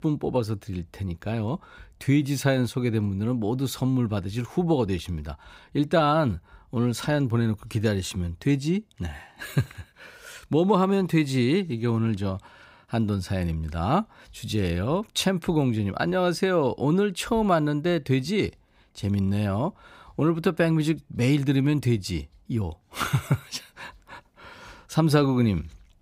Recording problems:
none

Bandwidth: 15.5 kHz